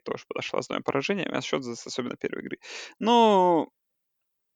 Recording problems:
none

